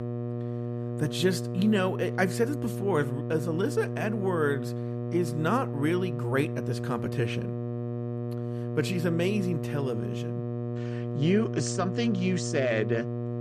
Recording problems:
electrical hum; loud; throughout; 60 Hz, 8 dB below the speech

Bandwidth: 14.5 kHz